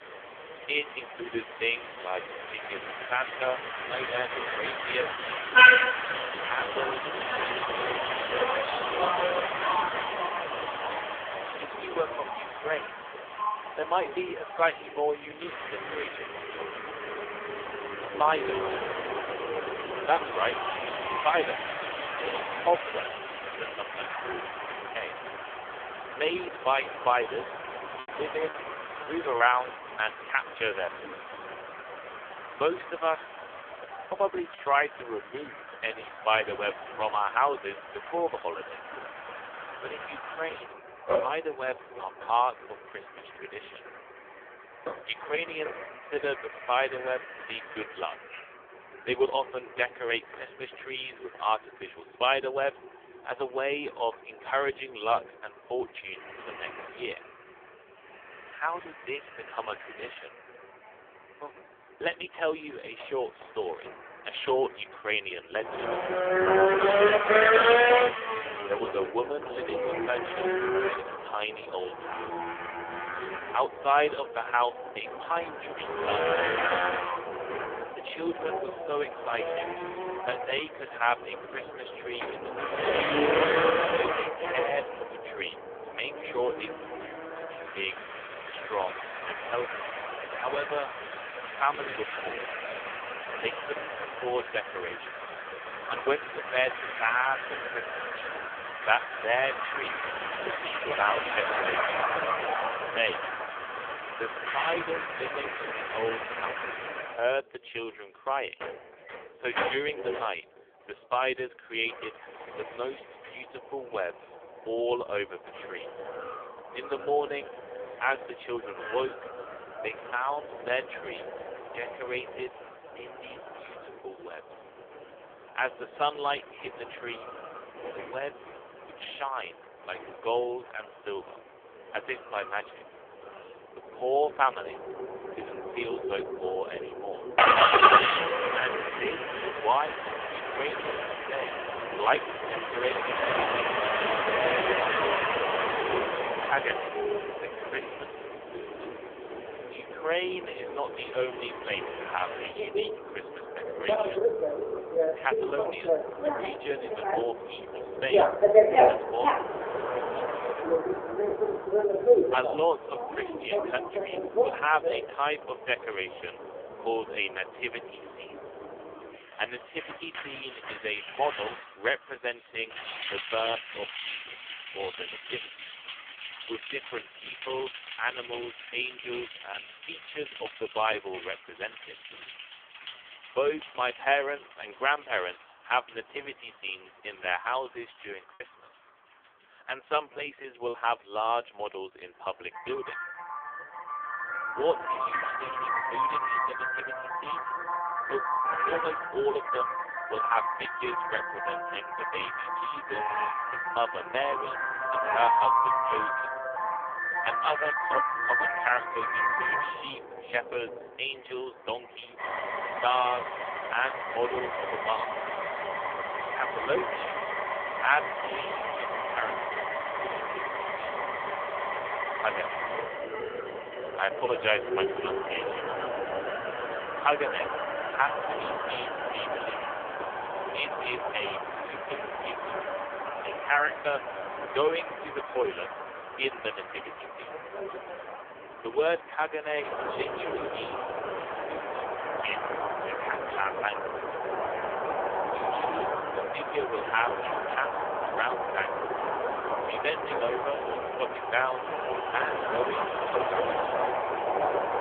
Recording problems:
phone-call audio; poor line; nothing above 3.5 kHz
traffic noise; very loud; throughout; 2 dB above the speech
choppy; occasionally; from 28 to 30 s and from 3:08 to 3:11; 5% of the speech affected

